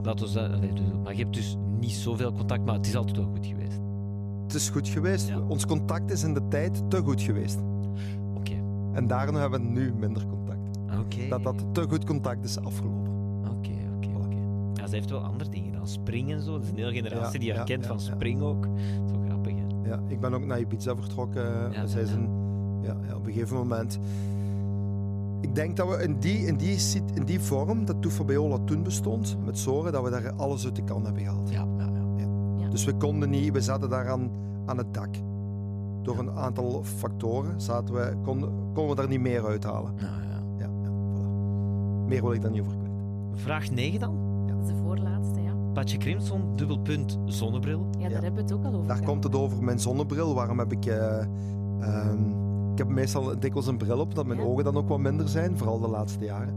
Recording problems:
electrical hum; loud; throughout; 50 Hz, 7 dB below the speech

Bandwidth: 14.5 kHz